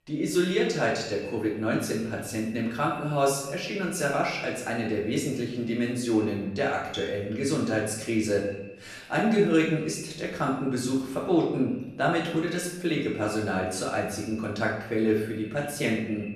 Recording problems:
off-mic speech; far
room echo; noticeable; dies away in 0.8 s
echo of what is said; faint; throughout; 120 ms later, 20 dB below the speech

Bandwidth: 13.5 kHz